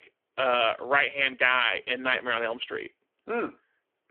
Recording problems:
phone-call audio; poor line; nothing above 3.5 kHz

